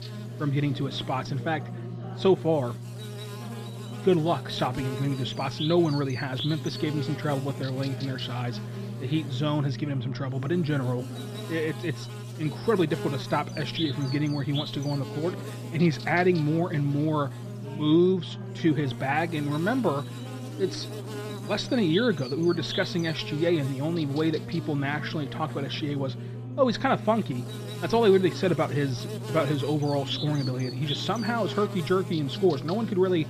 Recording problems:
muffled; slightly; fading above 3.5 kHz
electrical hum; noticeable; throughout; 60 Hz, 10 dB below the speech
background chatter; noticeable; throughout; 2 voices, 15 dB below the speech

